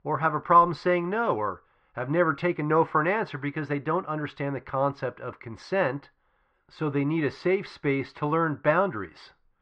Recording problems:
muffled; very; fading above 2.5 kHz

